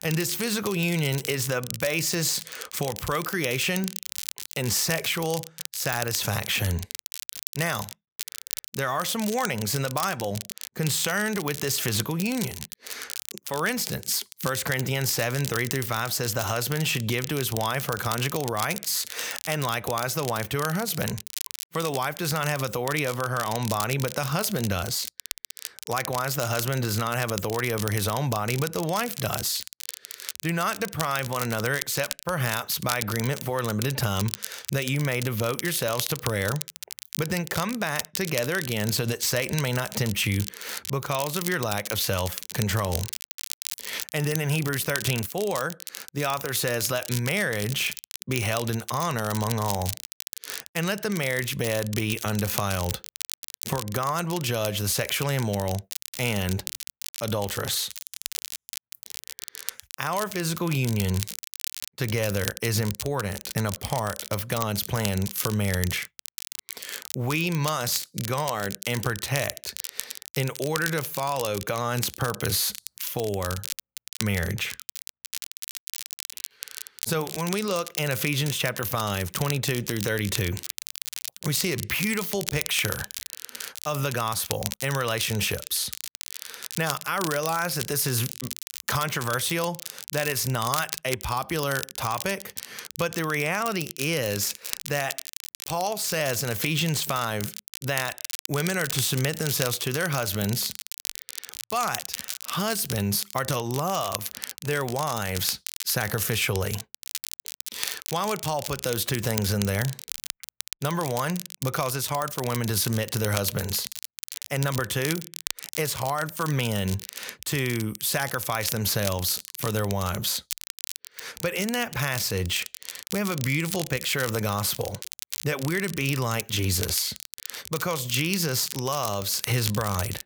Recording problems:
crackle, like an old record; loud; 8 dB below the speech

